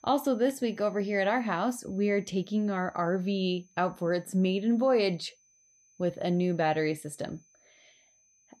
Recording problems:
high-pitched whine; faint; throughout; 6 kHz, 35 dB below the speech

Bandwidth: 14.5 kHz